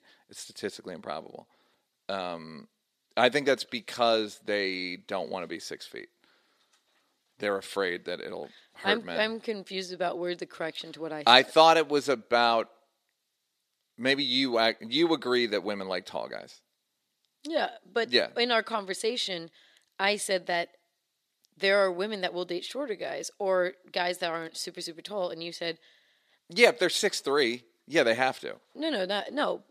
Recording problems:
thin; very slightly; fading below 350 Hz

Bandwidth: 14.5 kHz